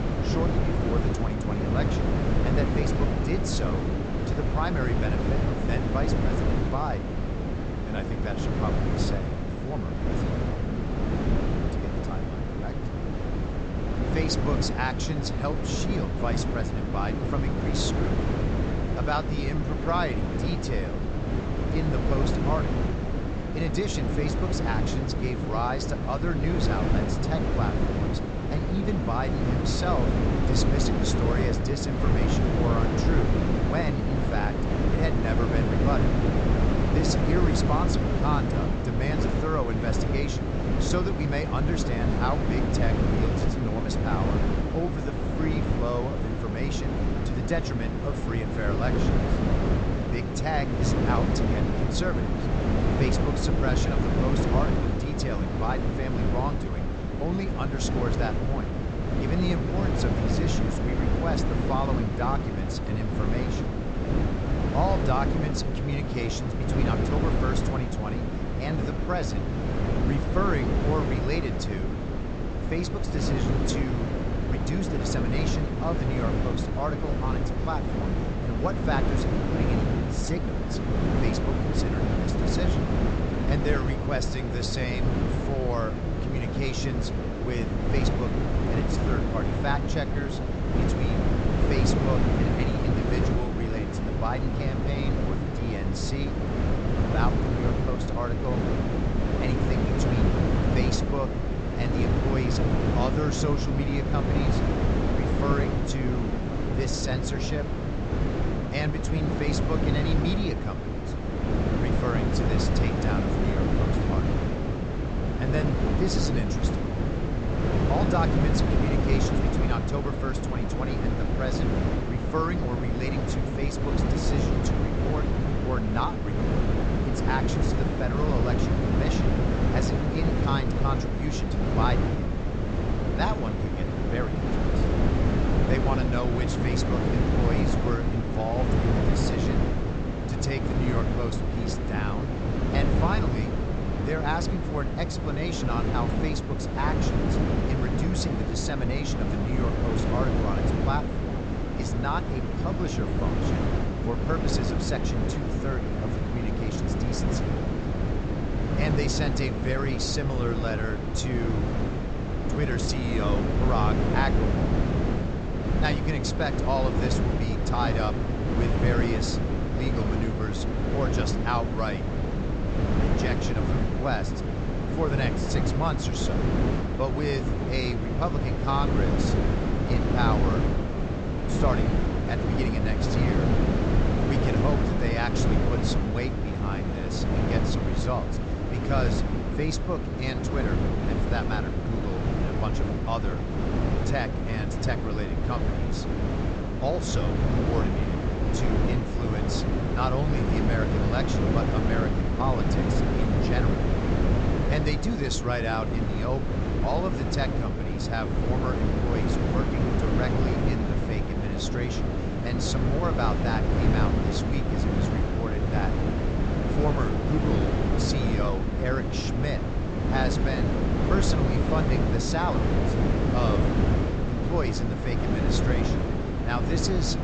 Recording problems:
high frequencies cut off; noticeable; nothing above 8 kHz
wind noise on the microphone; heavy; 1 dB above the speech

